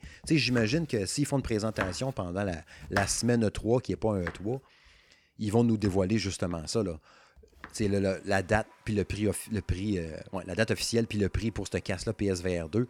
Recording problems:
household noises; noticeable; throughout; 10 dB below the speech

